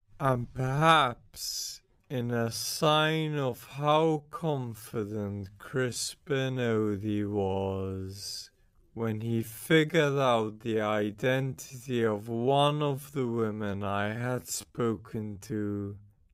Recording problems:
wrong speed, natural pitch; too slow; 0.5 times normal speed

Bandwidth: 15.5 kHz